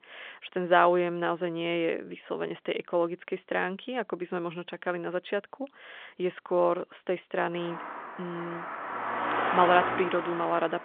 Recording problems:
phone-call audio
traffic noise; loud; from 7.5 s on; 3 dB below the speech

